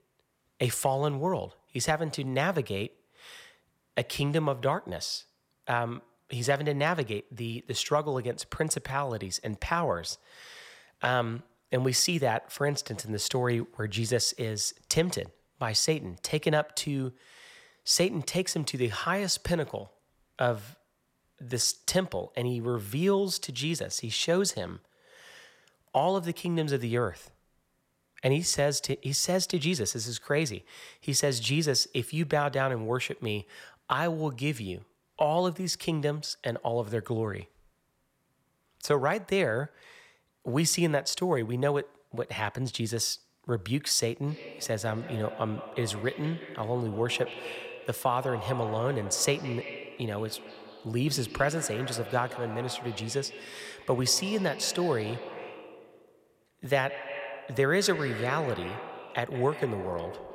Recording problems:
echo of what is said; strong; from 44 s on; 170 ms later, 10 dB below the speech

